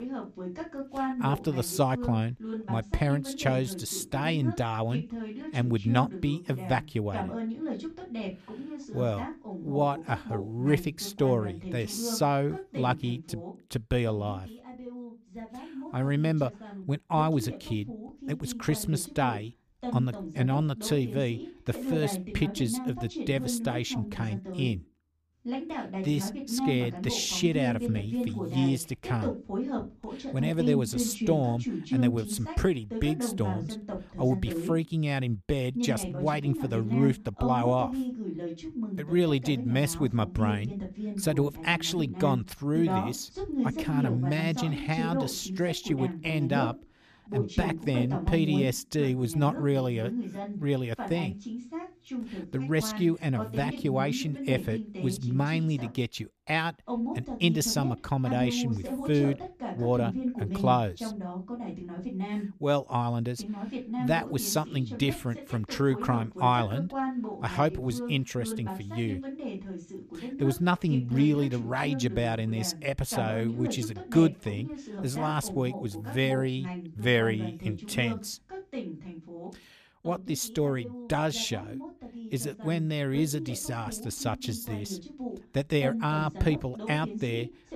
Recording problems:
voice in the background; loud; throughout; 7 dB below the speech

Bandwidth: 14.5 kHz